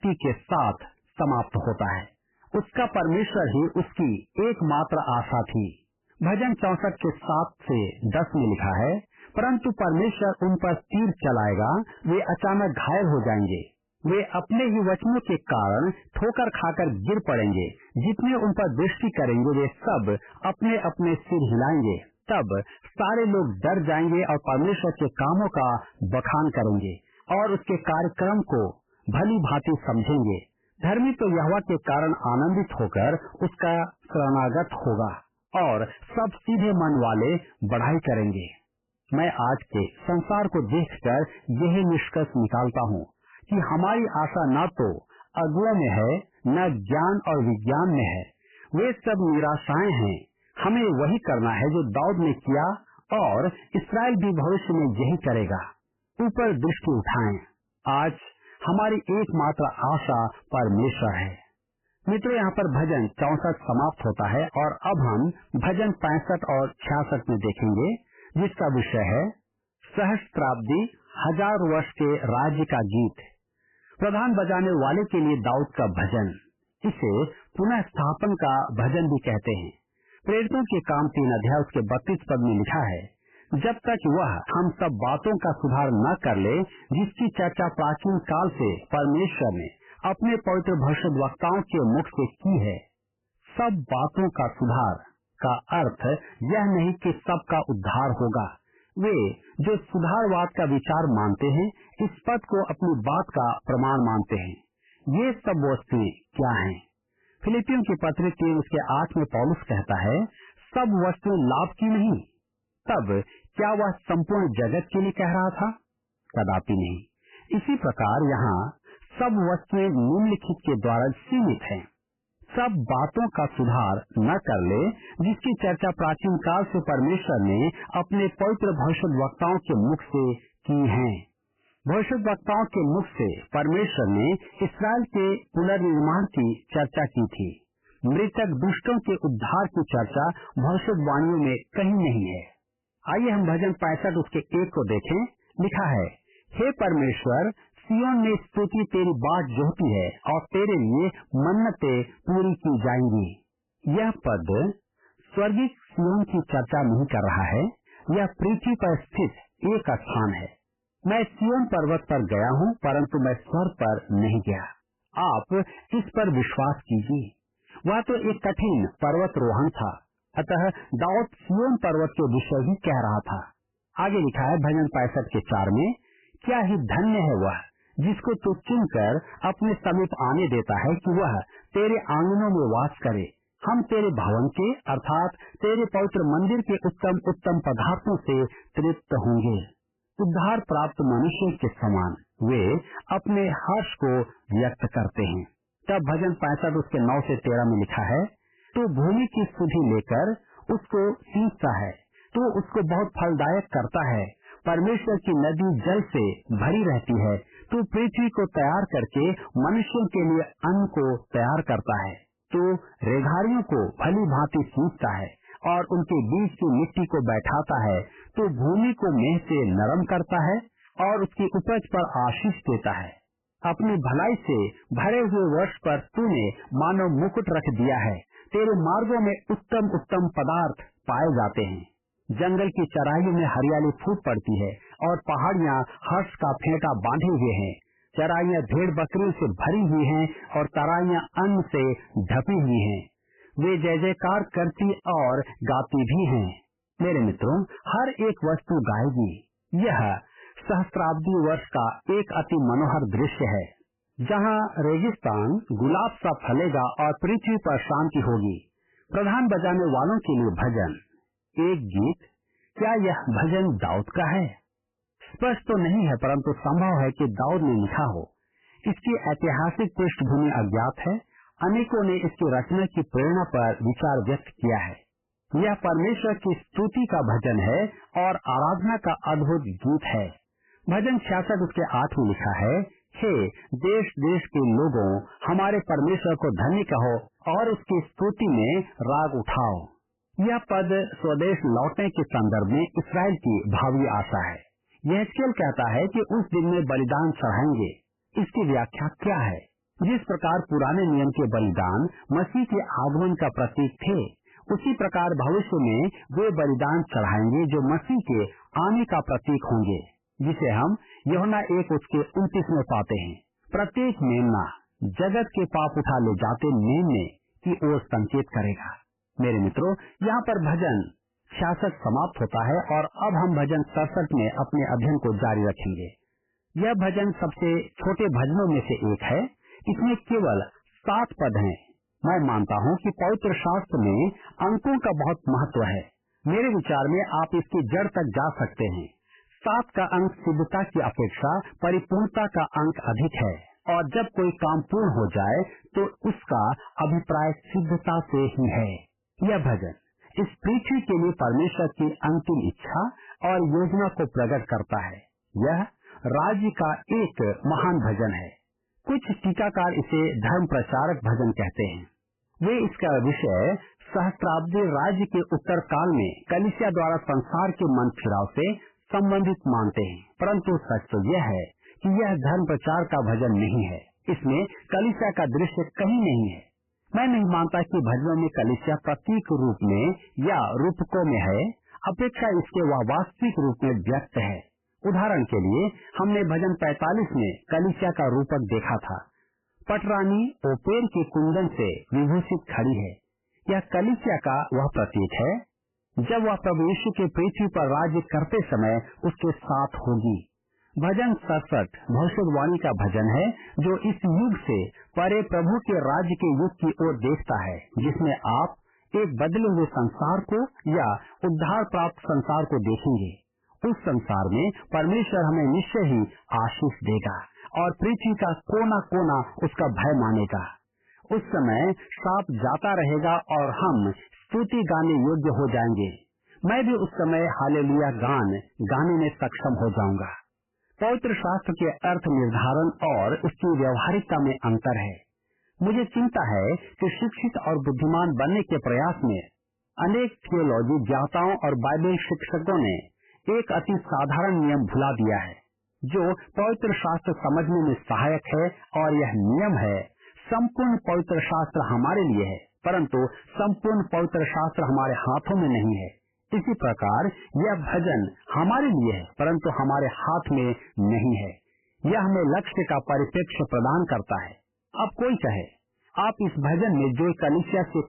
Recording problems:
garbled, watery; badly; nothing above 3 kHz
distortion; slight; 10 dB below the speech

